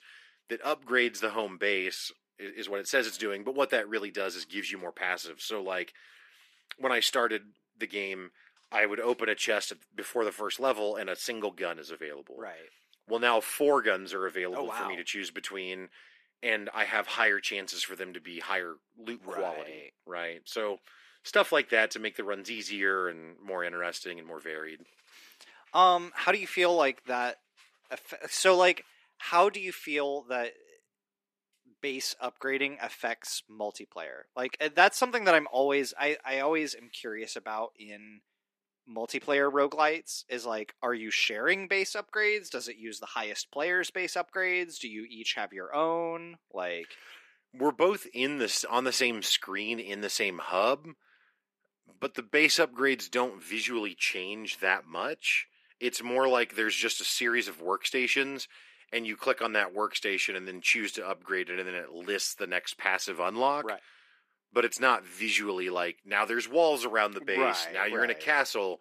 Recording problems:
thin; somewhat; fading below 300 Hz

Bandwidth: 14.5 kHz